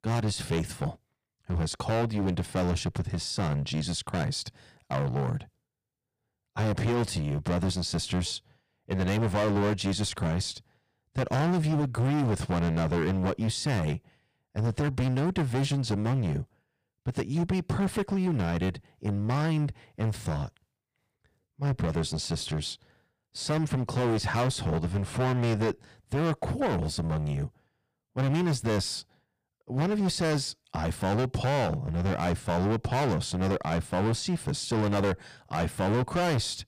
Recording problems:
distortion; heavy; 18% of the sound clipped

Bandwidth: 15 kHz